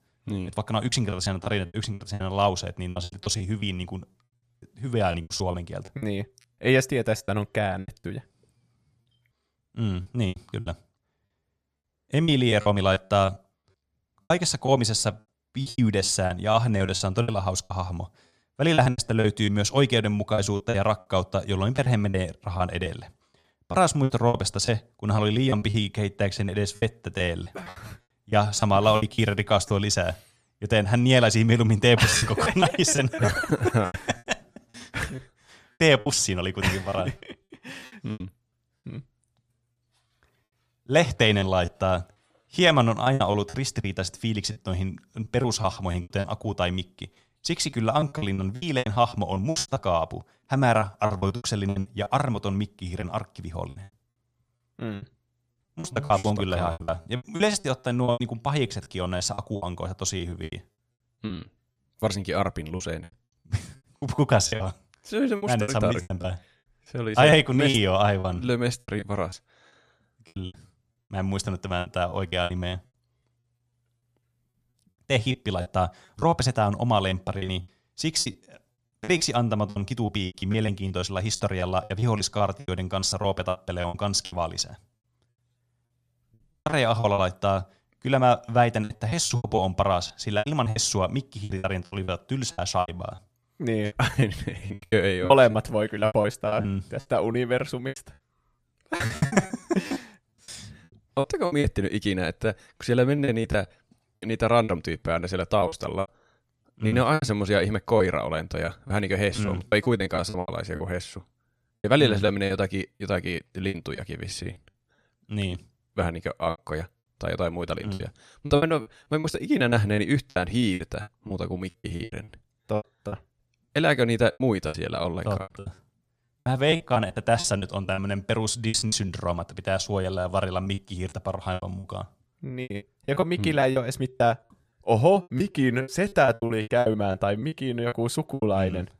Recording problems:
choppy; very; 14% of the speech affected

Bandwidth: 15 kHz